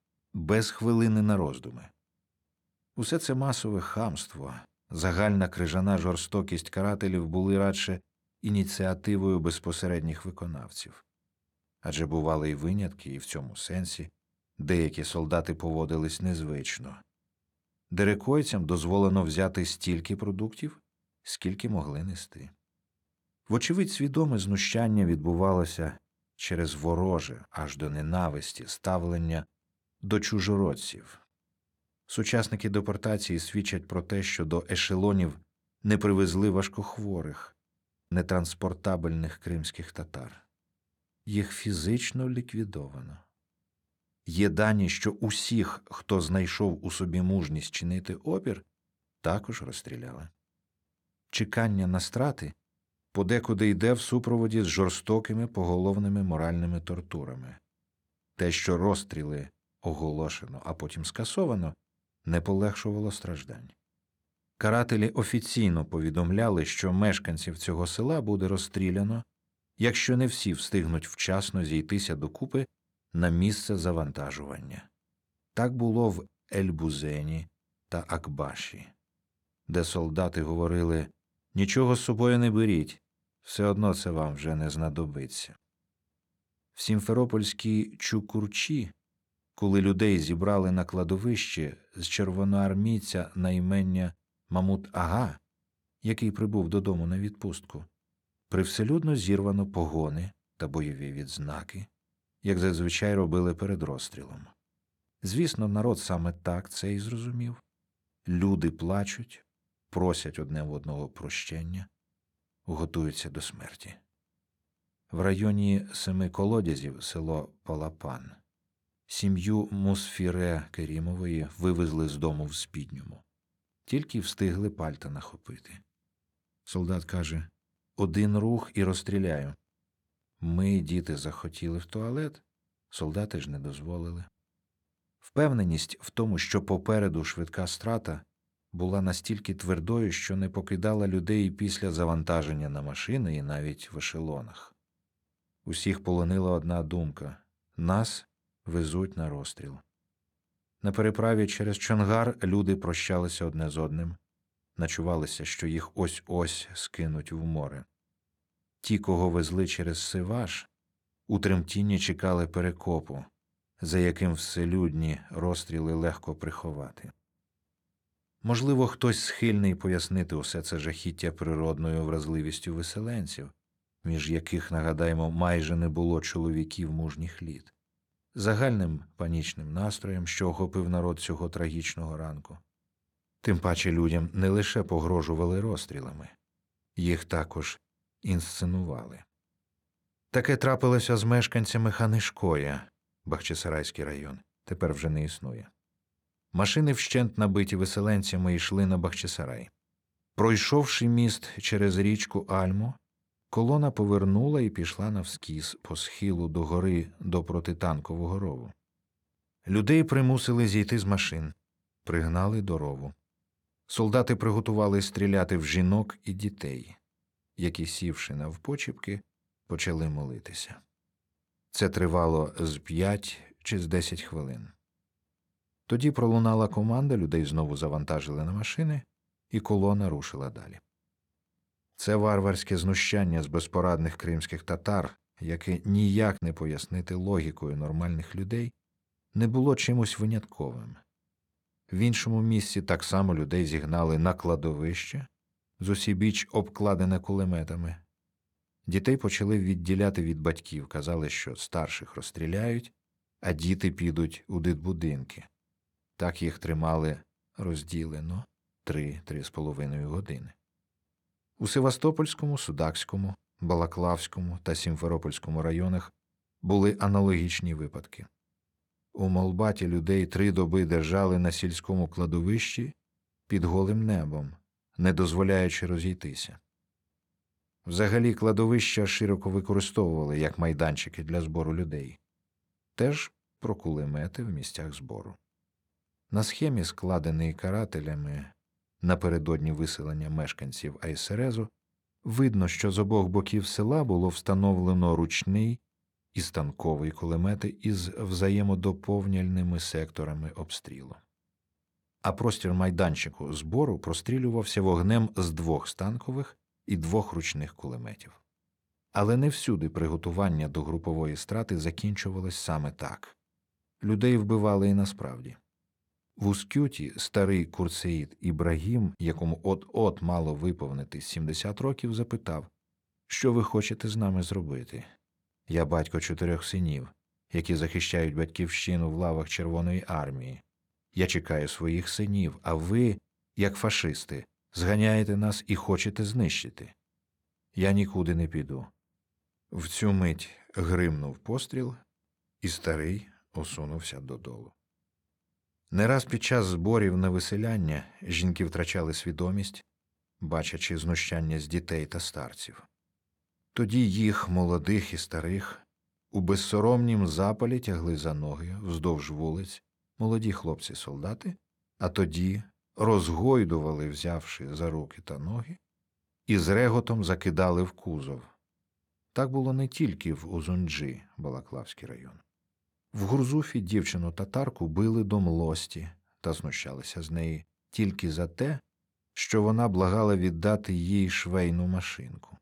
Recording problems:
none

